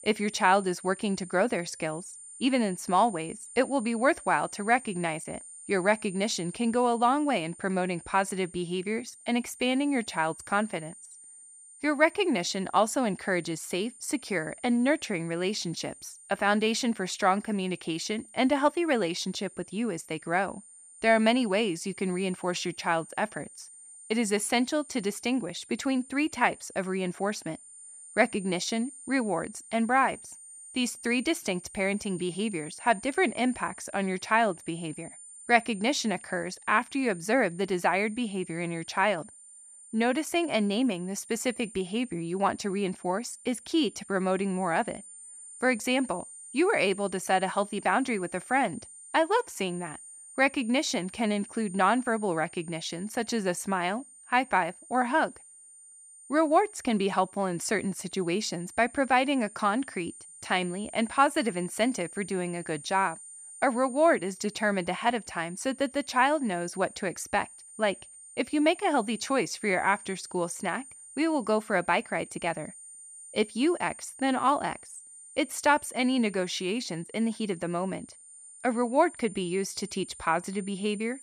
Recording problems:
high-pitched whine; noticeable; throughout; 9 kHz, 15 dB below the speech

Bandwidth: 14.5 kHz